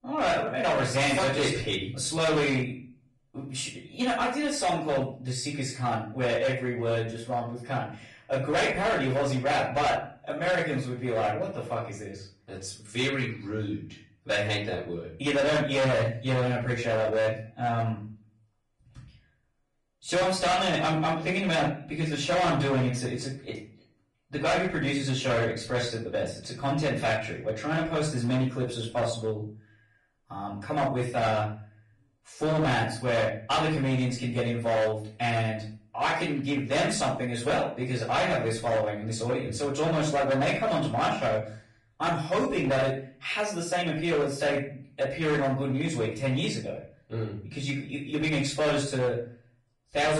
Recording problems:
distortion; heavy; 11% of the sound clipped
off-mic speech; far
room echo; slight; dies away in 0.4 s
garbled, watery; slightly
abrupt cut into speech; at the end

